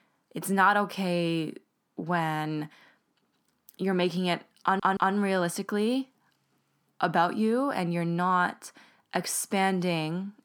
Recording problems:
audio stuttering; at 4.5 s

